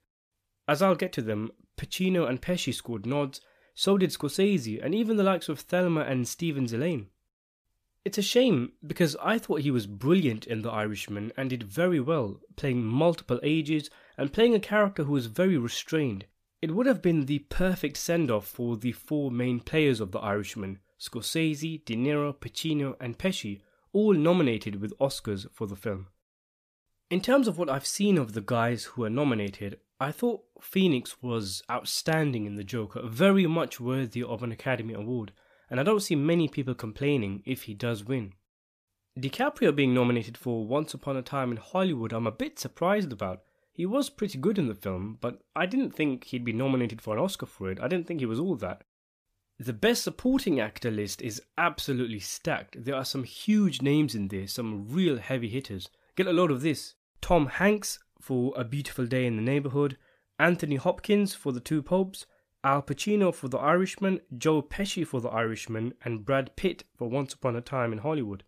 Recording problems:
none

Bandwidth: 14.5 kHz